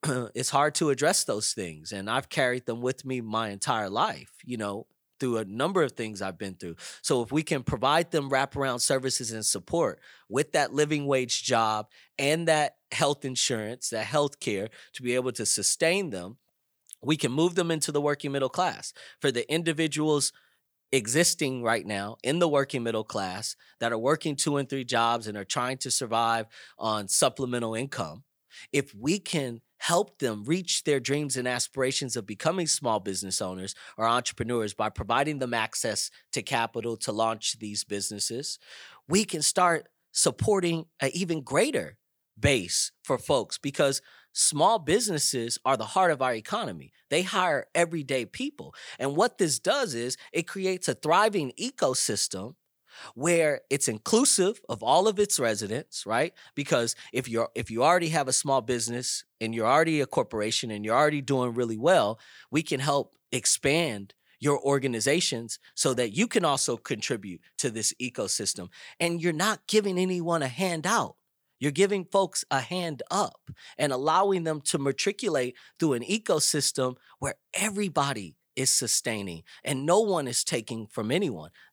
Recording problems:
none

